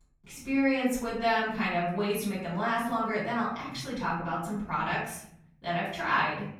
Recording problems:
off-mic speech; far
room echo; noticeable; dies away in 1 s

